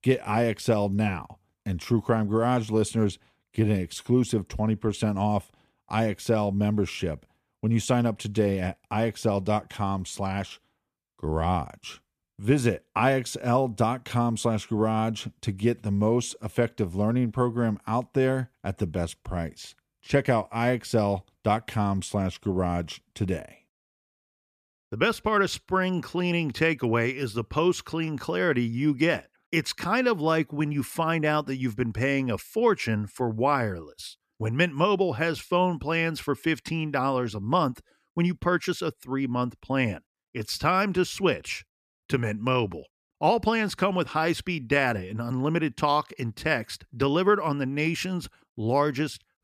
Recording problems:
none

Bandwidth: 14.5 kHz